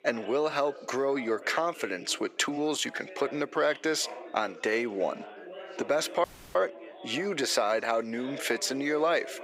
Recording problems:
thin; somewhat; fading below 500 Hz
chatter from many people; noticeable; throughout; 15 dB below the speech
audio cutting out; at 6 s

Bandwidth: 15.5 kHz